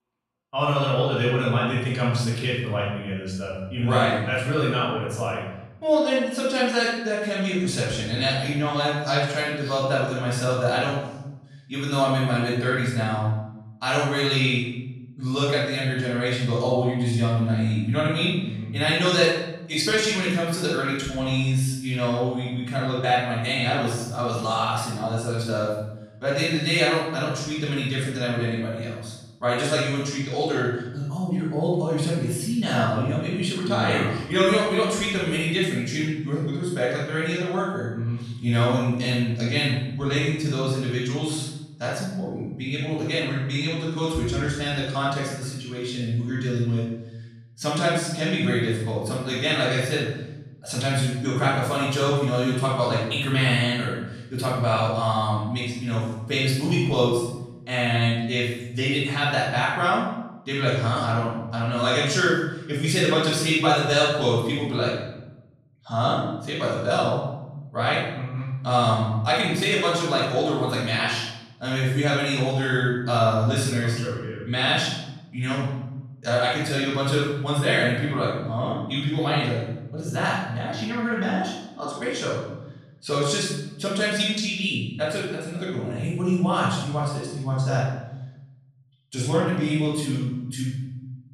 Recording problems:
room echo; strong; dies away in 1 s
off-mic speech; far

